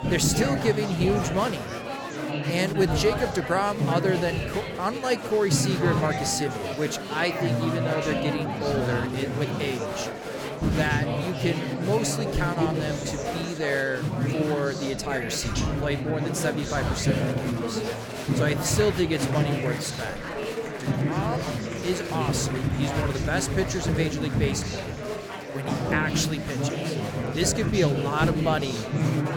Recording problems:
murmuring crowd; loud; throughout; as loud as the speech

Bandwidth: 17.5 kHz